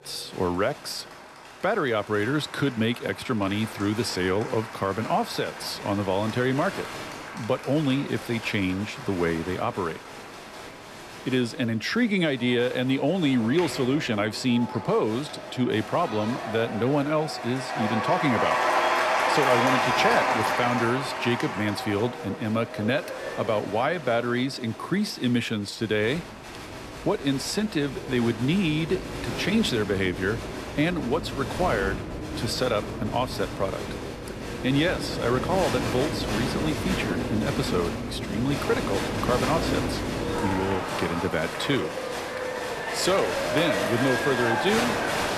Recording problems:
crowd noise; loud; throughout; 3 dB below the speech

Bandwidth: 13.5 kHz